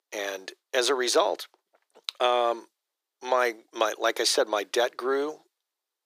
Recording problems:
thin; very; fading below 350 Hz

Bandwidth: 15 kHz